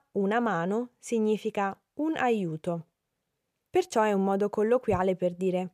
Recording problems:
none

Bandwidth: 15 kHz